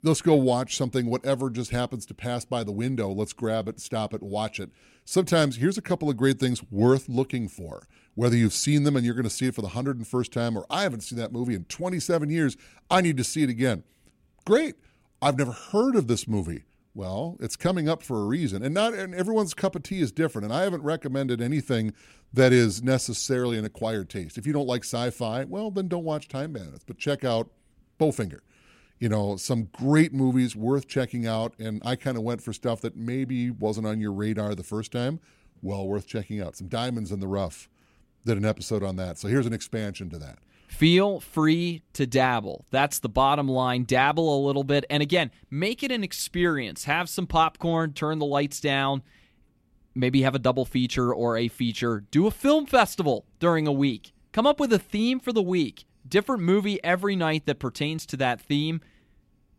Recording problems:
none

